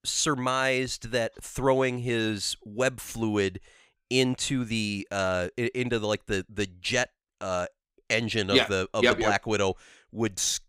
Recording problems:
none

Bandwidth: 15.5 kHz